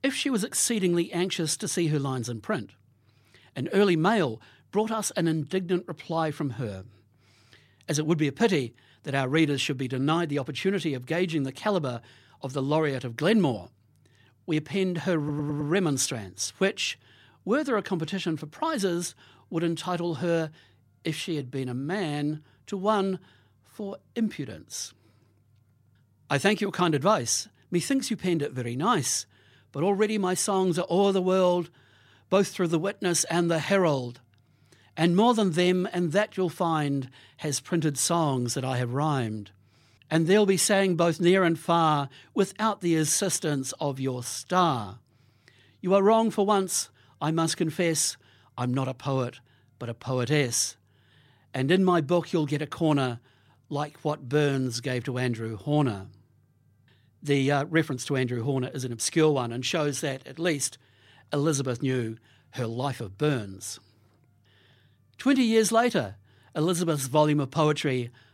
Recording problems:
audio stuttering; at 15 s

